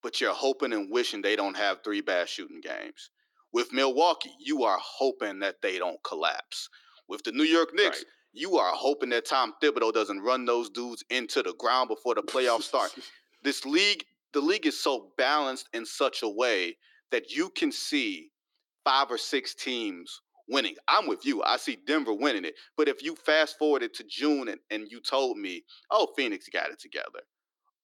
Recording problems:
thin; somewhat; fading below 300 Hz

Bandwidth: 18.5 kHz